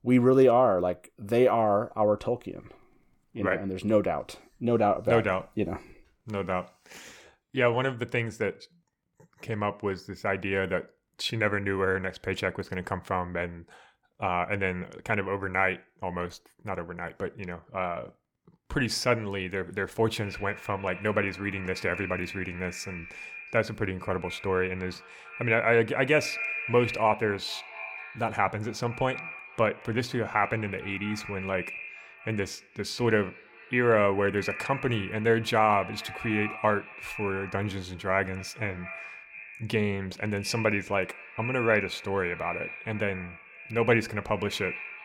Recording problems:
echo of what is said; strong; from 20 s on; 220 ms later, 10 dB below the speech

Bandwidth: 18 kHz